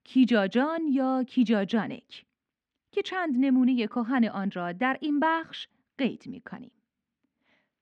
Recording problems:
muffled; slightly; fading above 2.5 kHz

